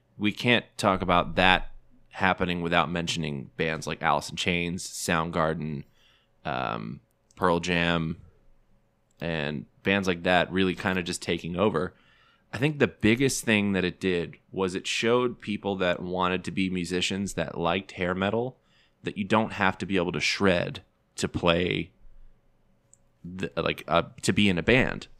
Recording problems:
none

